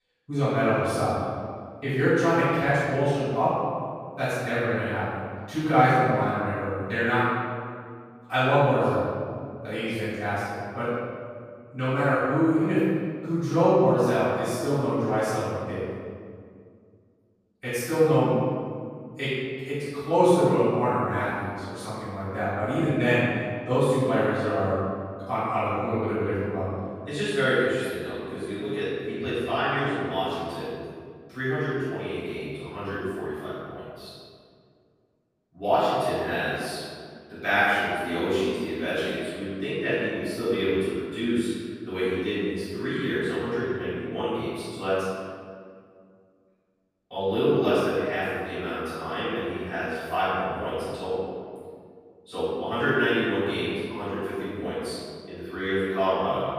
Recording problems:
room echo; strong; dies away in 1.9 s
off-mic speech; far

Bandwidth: 15 kHz